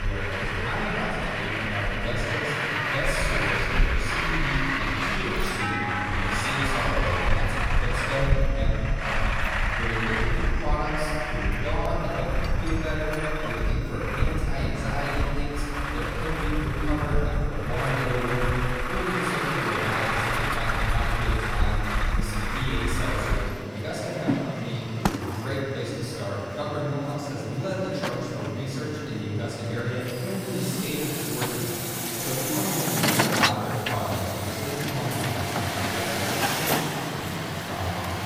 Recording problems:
room echo; strong; dies away in 2.5 s
off-mic speech; far
traffic noise; very loud; throughout; 3 dB above the speech
chatter from many people; noticeable; throughout; 15 dB below the speech
high-pitched whine; faint; throughout; 2.5 kHz, 20 dB below the speech
abrupt cut into speech; at the start

